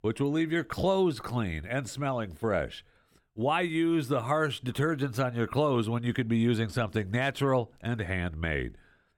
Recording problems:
none

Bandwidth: 17 kHz